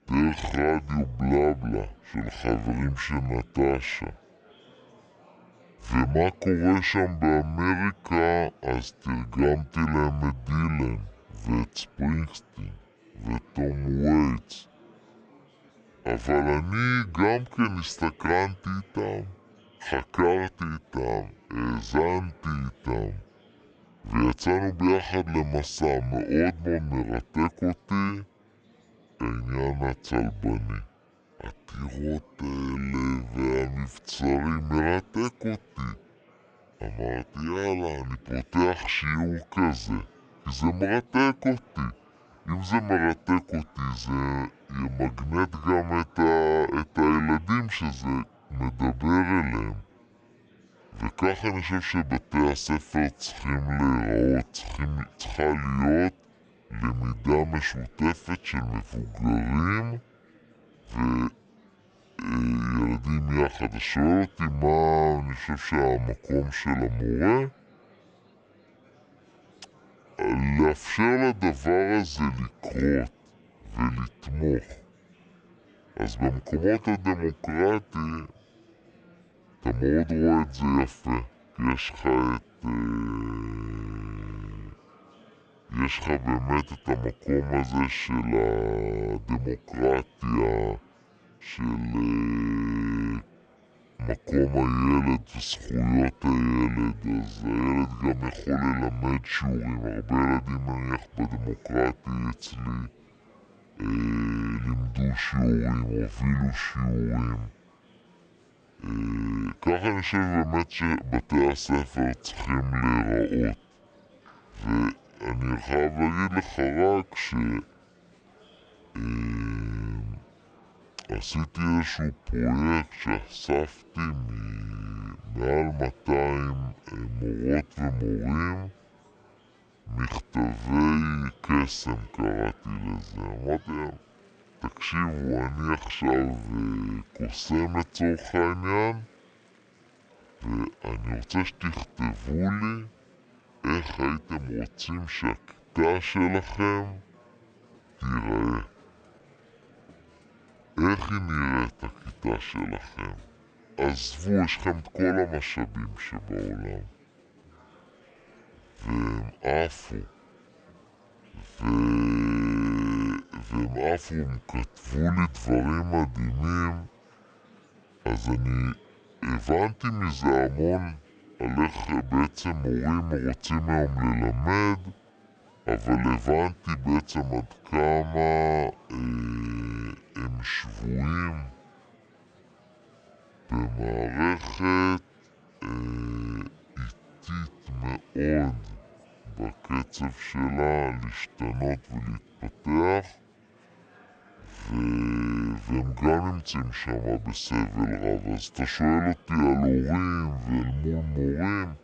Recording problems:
wrong speed and pitch; too slow and too low; 0.6 times normal speed
murmuring crowd; faint; throughout; 30 dB below the speech

